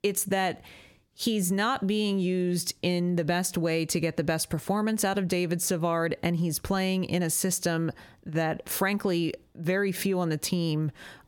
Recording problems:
squashed, flat; somewhat

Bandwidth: 17 kHz